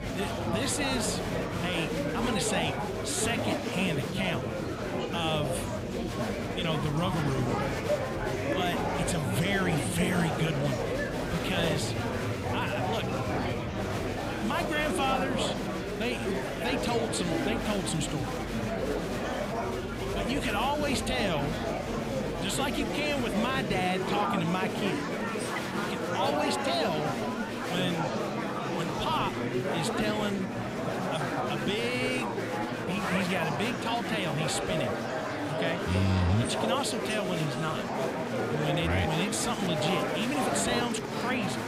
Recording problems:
murmuring crowd; very loud; throughout; as loud as the speech

